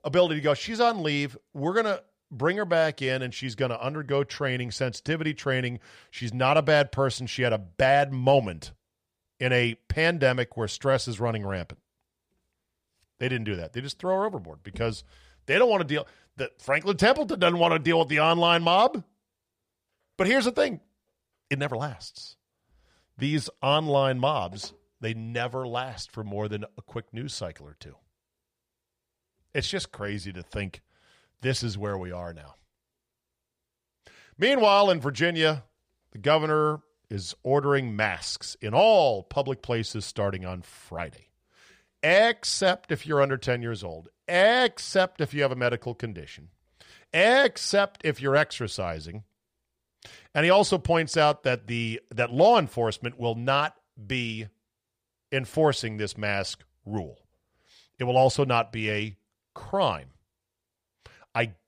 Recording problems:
none

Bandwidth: 15 kHz